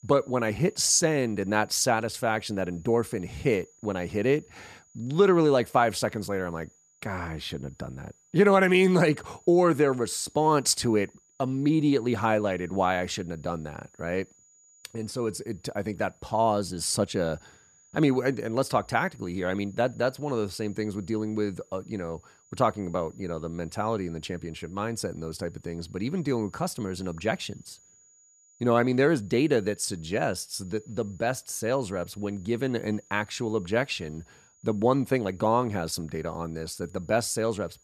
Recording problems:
high-pitched whine; faint; throughout; 7 kHz, 30 dB below the speech

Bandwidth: 14 kHz